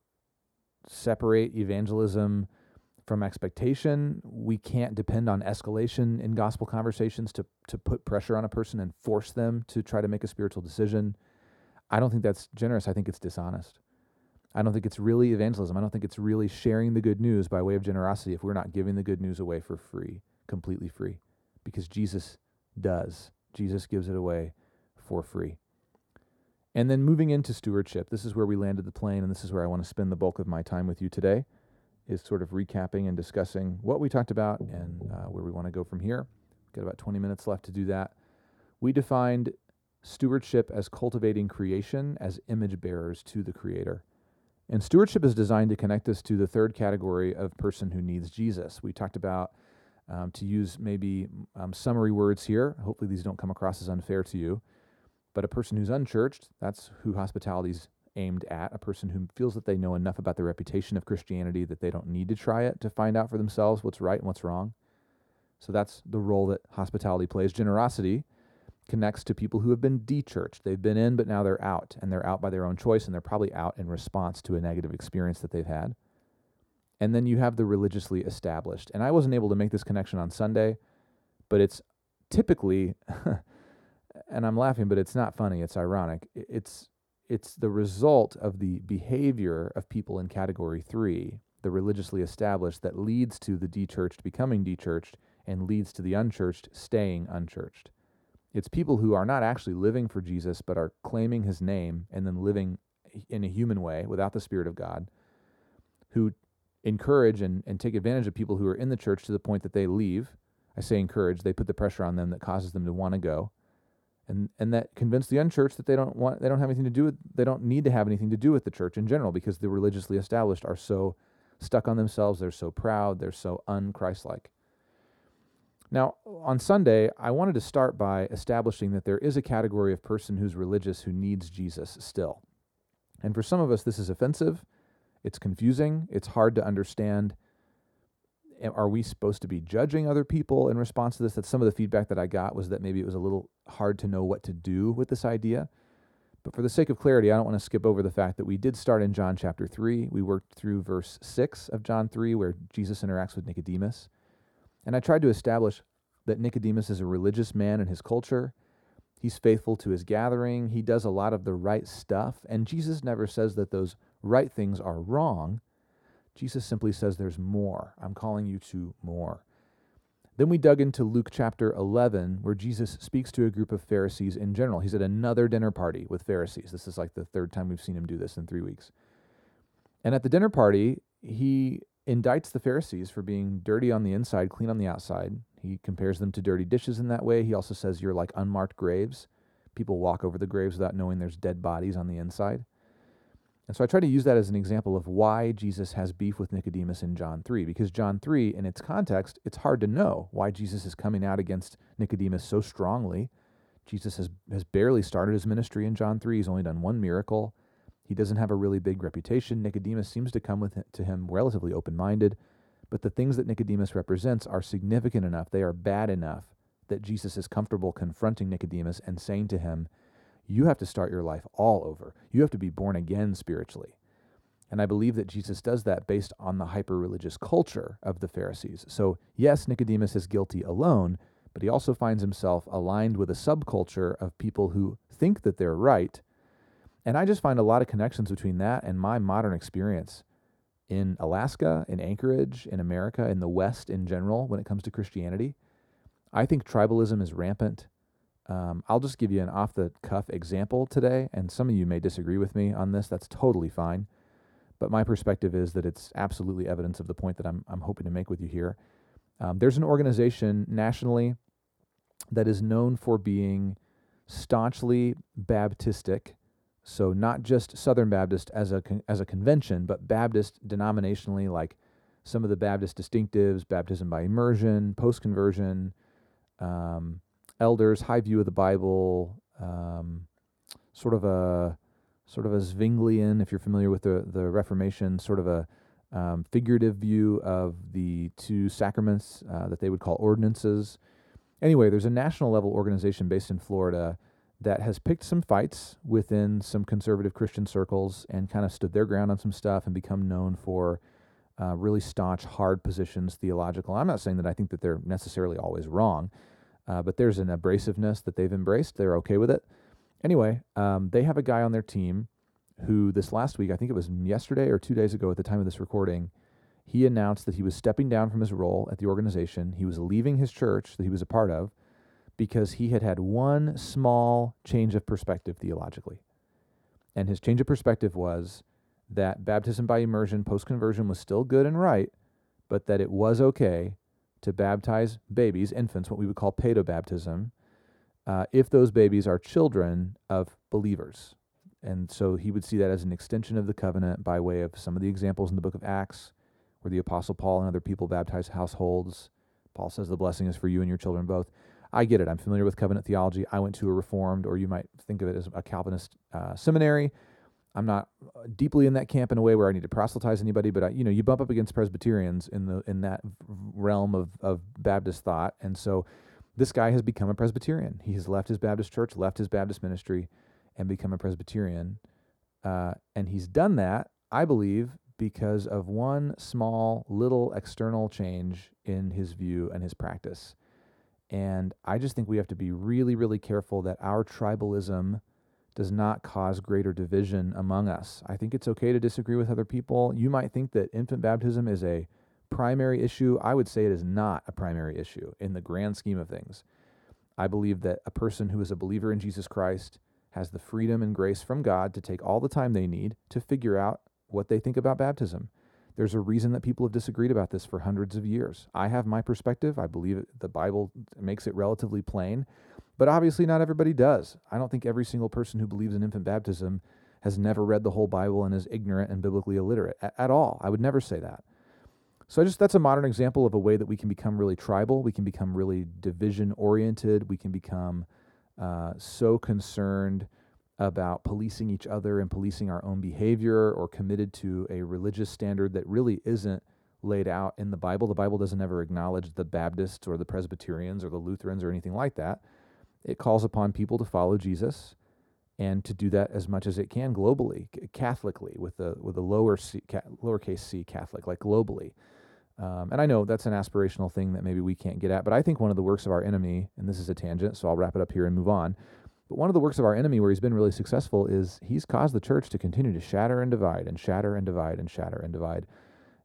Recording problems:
muffled; slightly; fading above 1.5 kHz

